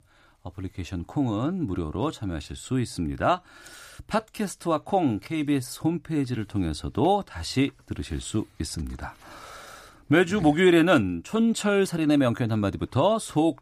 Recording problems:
none

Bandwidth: 15 kHz